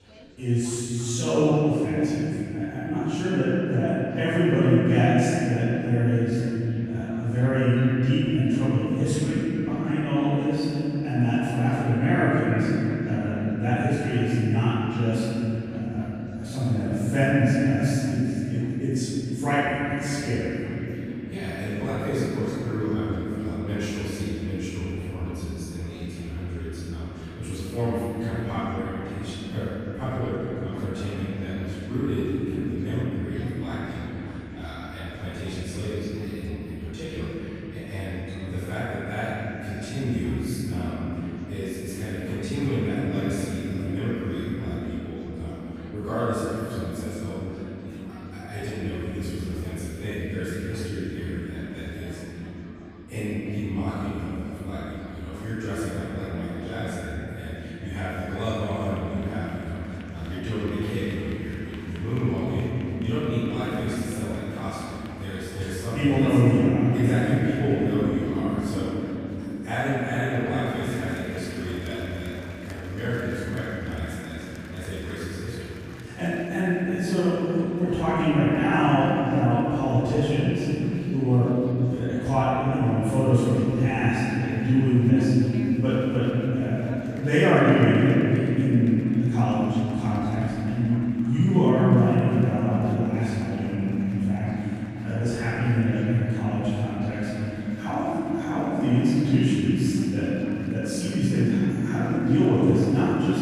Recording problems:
room echo; strong; dies away in 3 s
off-mic speech; far
chatter from many people; faint; throughout; 25 dB below the speech

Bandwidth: 14.5 kHz